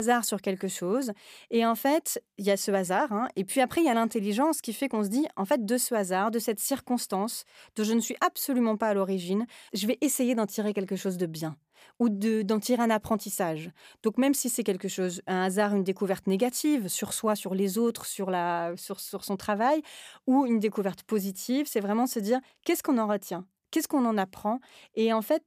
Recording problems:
abrupt cut into speech; at the start

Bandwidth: 15 kHz